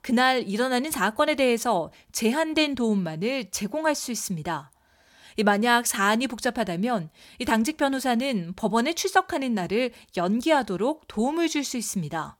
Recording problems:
none

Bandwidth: 17 kHz